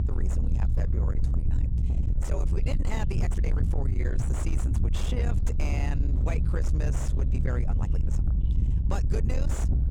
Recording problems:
distortion; slight; 10 dB below the speech
low rumble; loud; throughout; 4 dB below the speech
voice in the background; faint; throughout; 20 dB below the speech
uneven, jittery; strongly; from 0.5 to 8.5 s

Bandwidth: 18 kHz